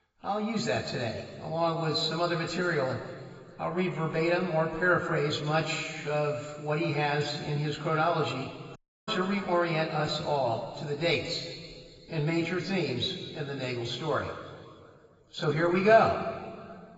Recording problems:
garbled, watery; badly; nothing above 7.5 kHz
room echo; noticeable; dies away in 2.2 s
off-mic speech; somewhat distant
audio cutting out; at 9 s

